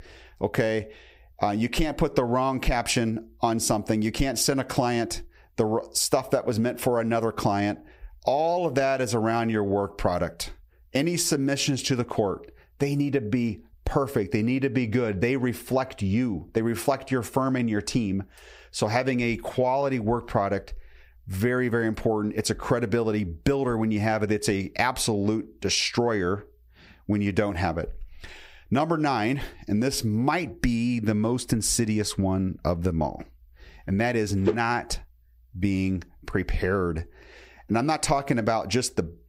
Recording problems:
squashed, flat; heavily

